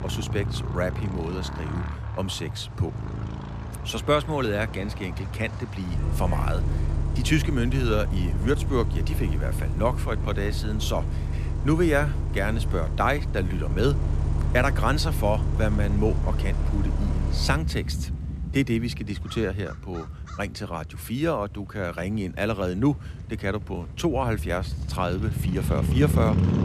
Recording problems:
traffic noise; loud; throughout; 1 dB below the speech

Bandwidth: 14 kHz